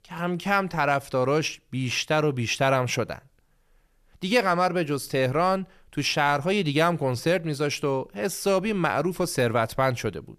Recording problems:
none

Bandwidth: 14 kHz